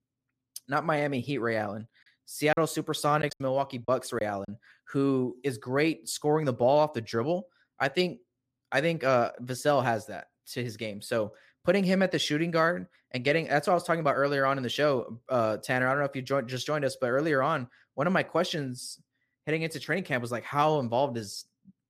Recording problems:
choppy; very; from 2.5 to 4.5 s; 6% of the speech affected

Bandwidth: 14.5 kHz